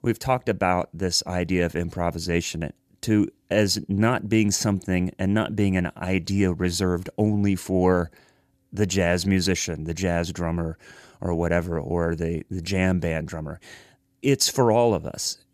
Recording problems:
none

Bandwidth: 14.5 kHz